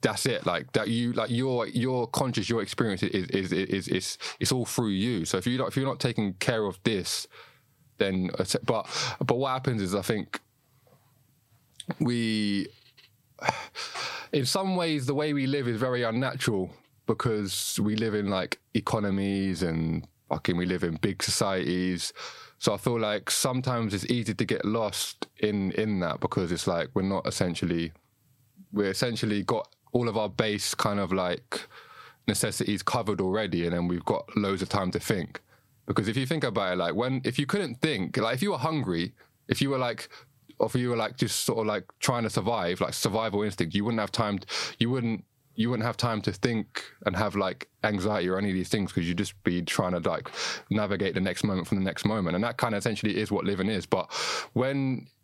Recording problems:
squashed, flat; somewhat

